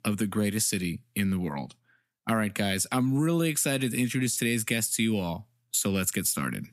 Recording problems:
squashed, flat; somewhat

